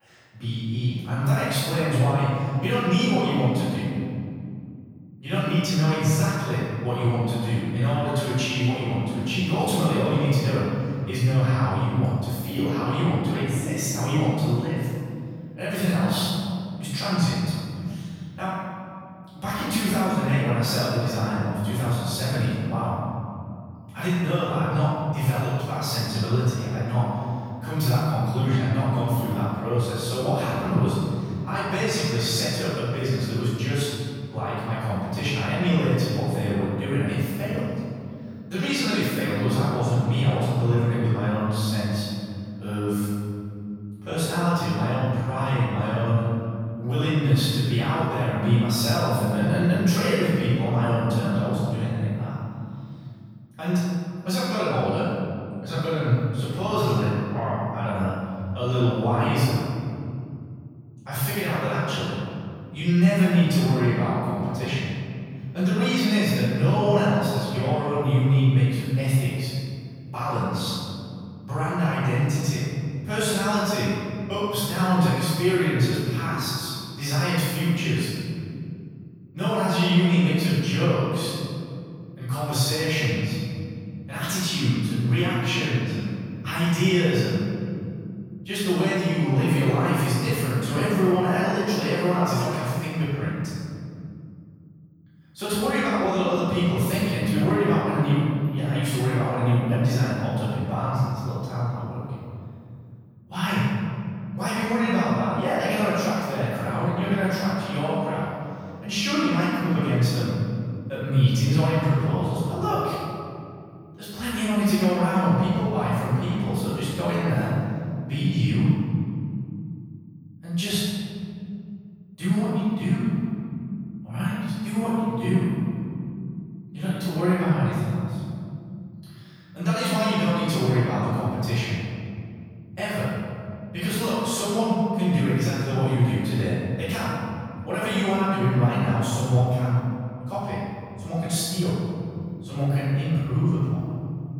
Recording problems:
room echo; strong; dies away in 2.7 s
off-mic speech; far

